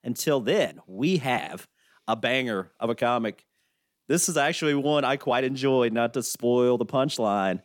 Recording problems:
uneven, jittery; strongly; from 0.5 to 6.5 s

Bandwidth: 17.5 kHz